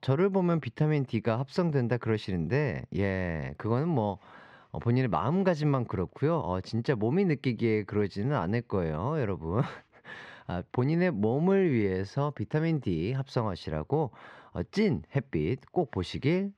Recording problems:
muffled; very slightly; fading above 3 kHz

